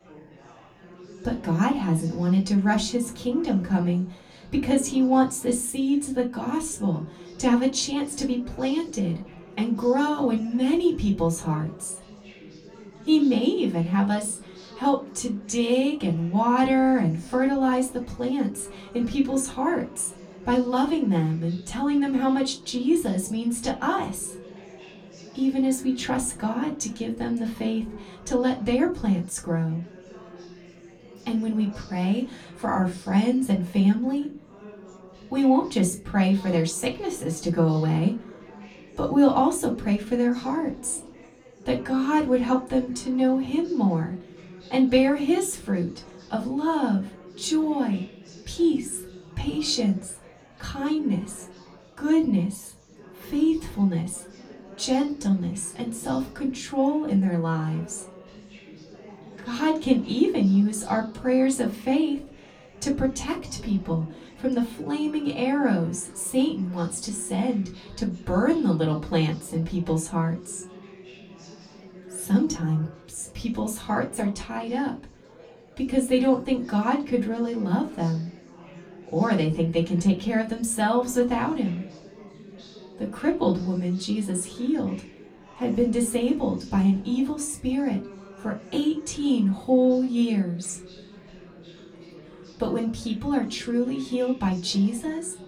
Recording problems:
off-mic speech; far
room echo; very slight; dies away in 0.2 s
chatter from many people; faint; throughout; 20 dB below the speech

